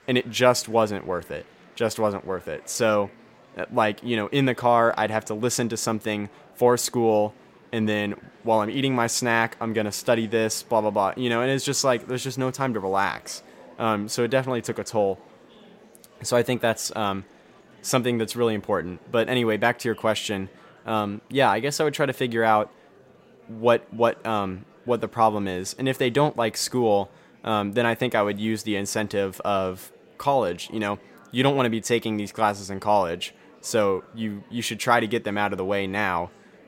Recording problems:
murmuring crowd; faint; throughout; 25 dB below the speech

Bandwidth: 16 kHz